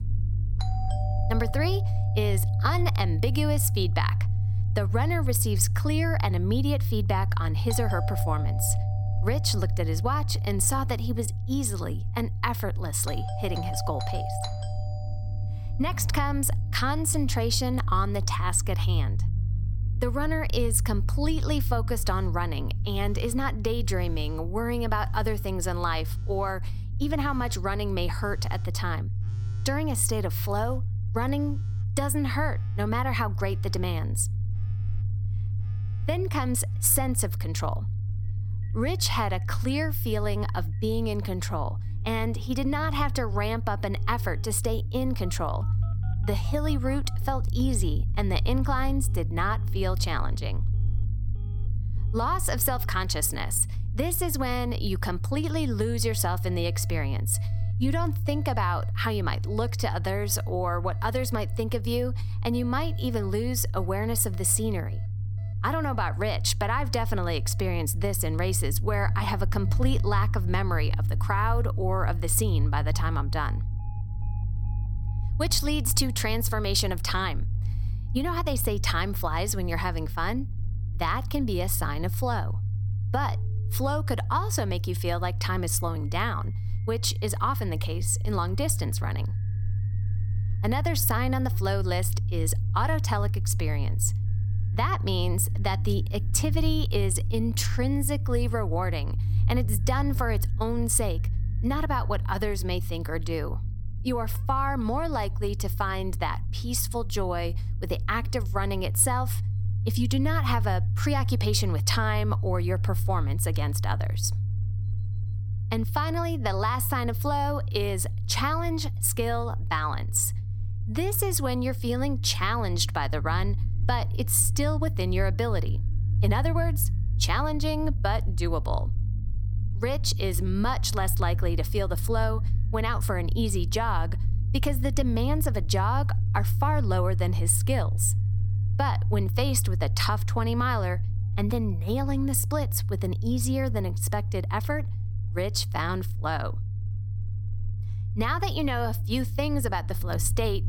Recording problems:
alarms or sirens; noticeable; throughout; 20 dB below the speech
low rumble; noticeable; throughout; 15 dB below the speech

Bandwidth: 17 kHz